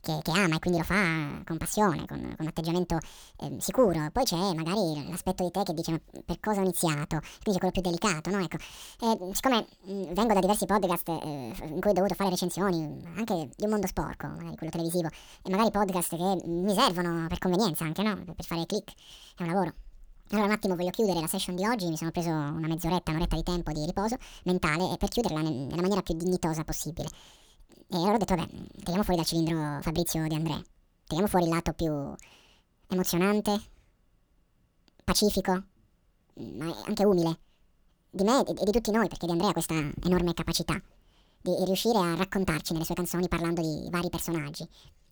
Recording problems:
wrong speed and pitch; too fast and too high; 1.7 times normal speed

